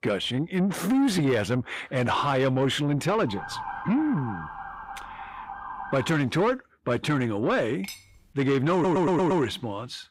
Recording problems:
distortion; slight; 10 dB below the speech
siren; noticeable; from 3.5 to 6 s; peak 9 dB below the speech
clattering dishes; faint; at 8 s; peak 15 dB below the speech
audio stuttering; at 8.5 s

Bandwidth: 15.5 kHz